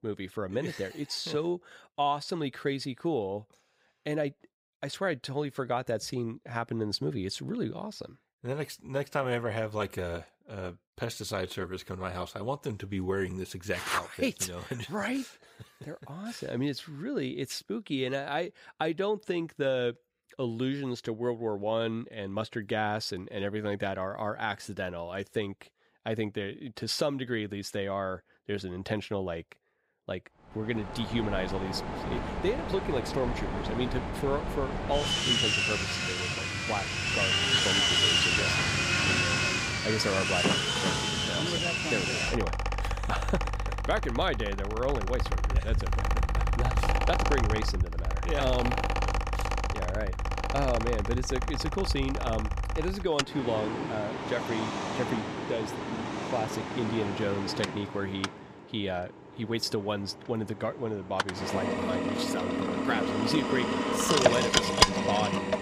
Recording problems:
machinery noise; very loud; from 31 s on; 4 dB above the speech

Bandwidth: 15.5 kHz